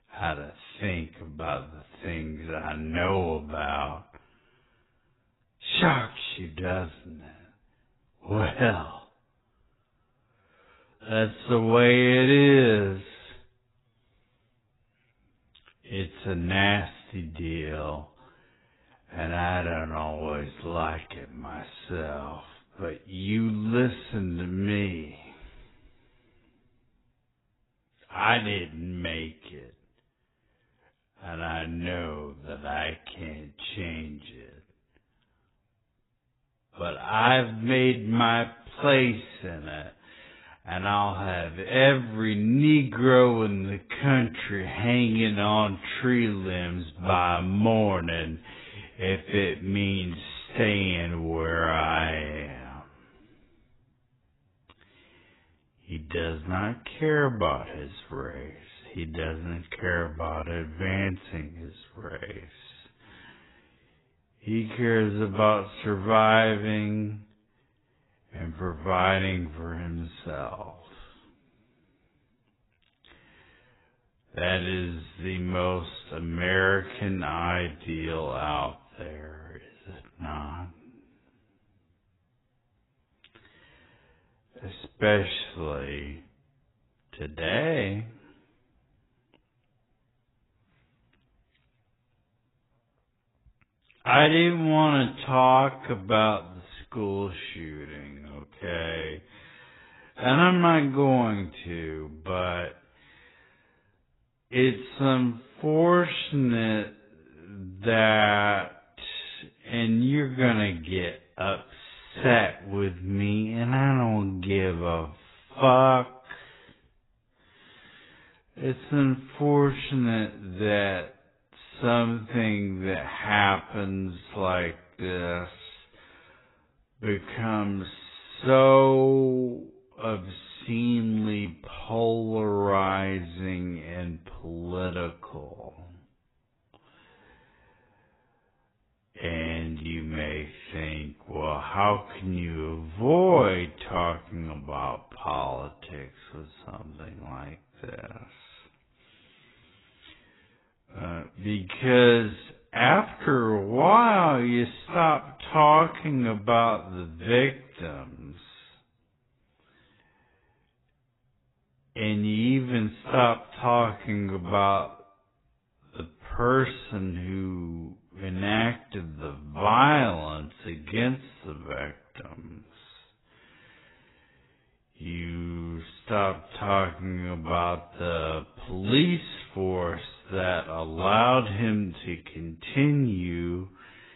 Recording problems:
garbled, watery; badly; nothing above 4 kHz
wrong speed, natural pitch; too slow; 0.5 times normal speed

